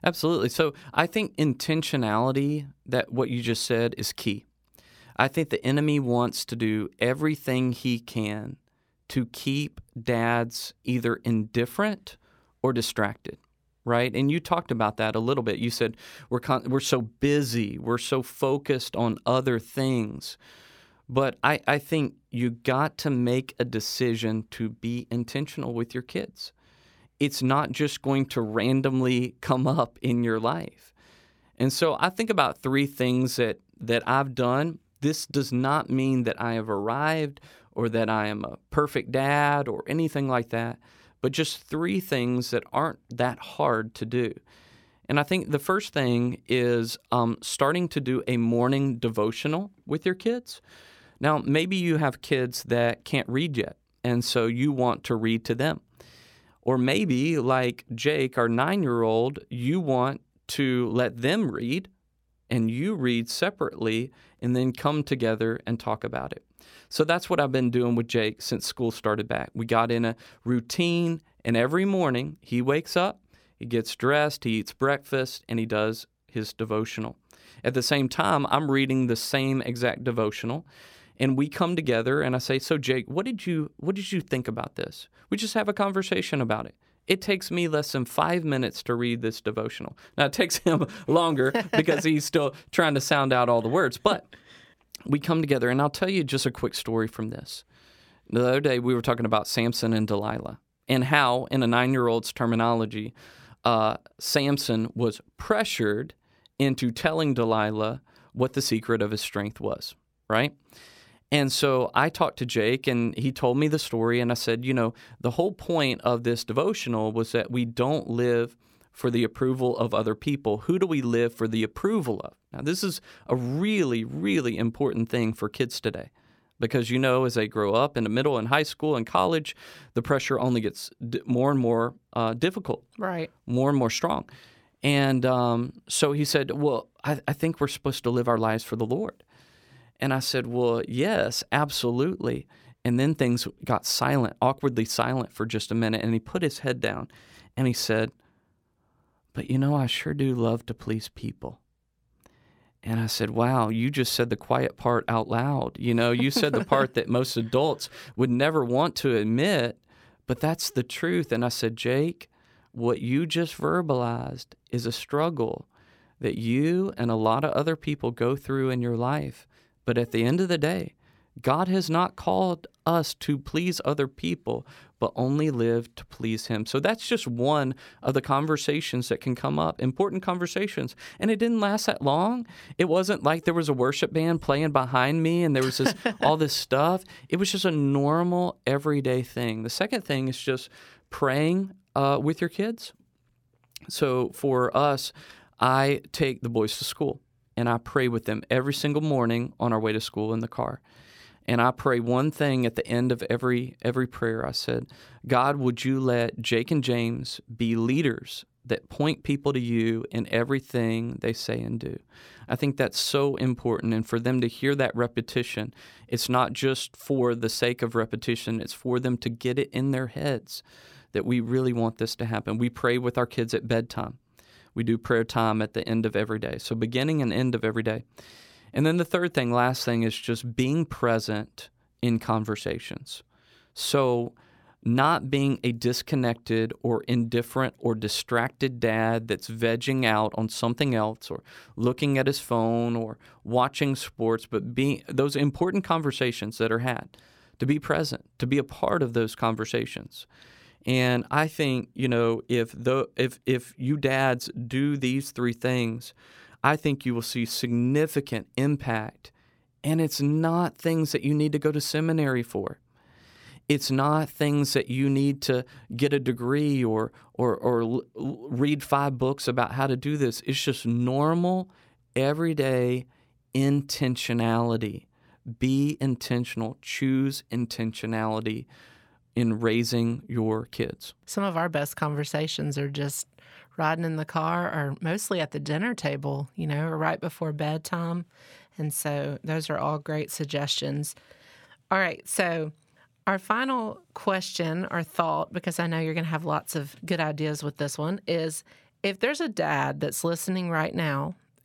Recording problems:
none

